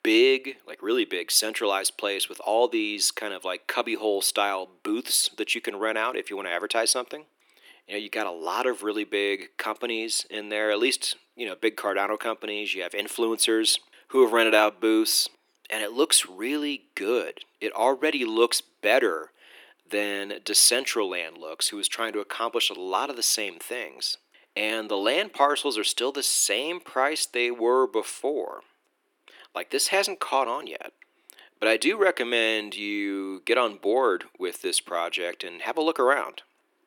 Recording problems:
thin; very; fading below 300 Hz

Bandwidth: 18.5 kHz